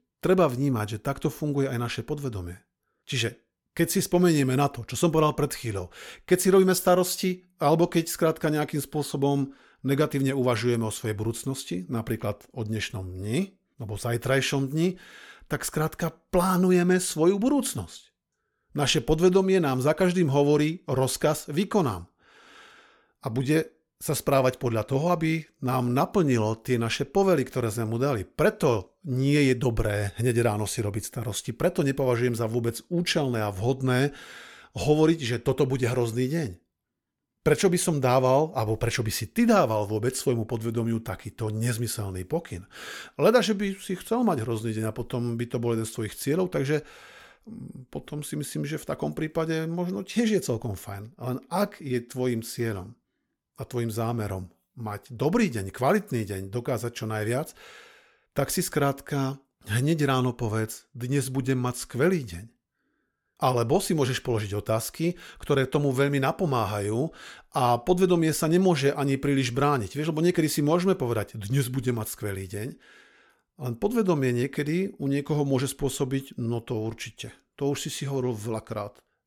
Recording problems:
none

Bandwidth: 17.5 kHz